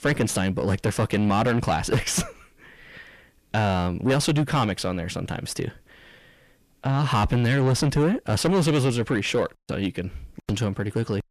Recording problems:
distortion; heavy; 6 dB below the speech

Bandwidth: 14.5 kHz